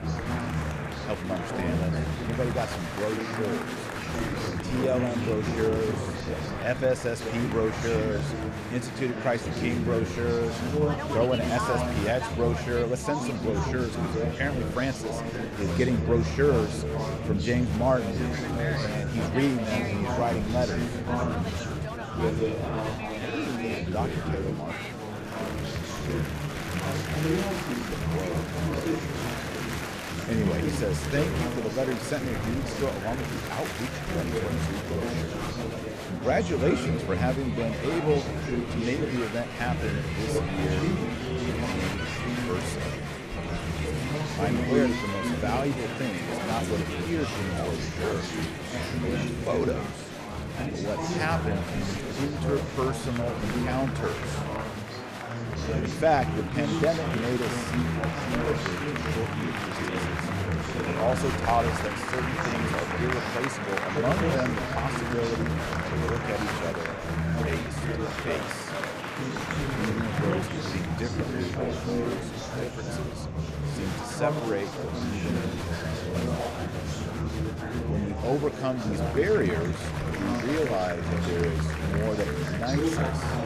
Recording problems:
murmuring crowd; very loud; throughout; 1 dB above the speech

